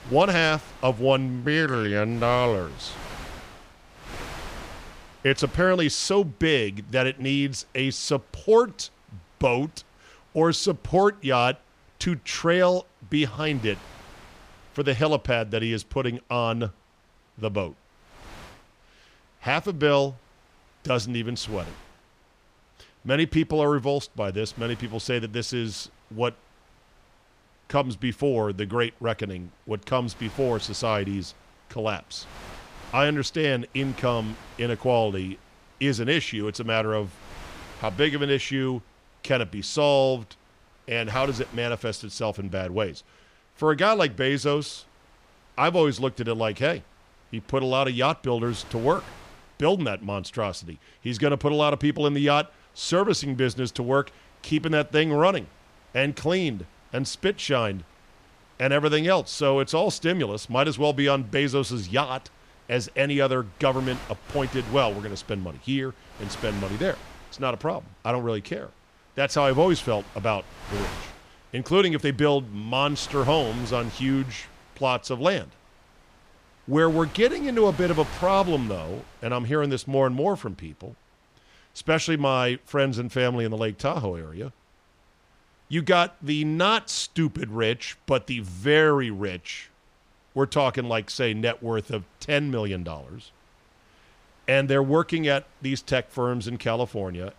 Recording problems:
wind noise on the microphone; occasional gusts; 20 dB below the speech

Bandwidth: 15 kHz